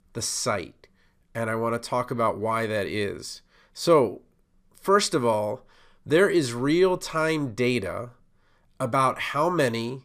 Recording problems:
none

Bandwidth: 15 kHz